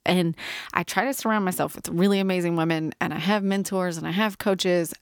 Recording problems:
none

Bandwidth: 18.5 kHz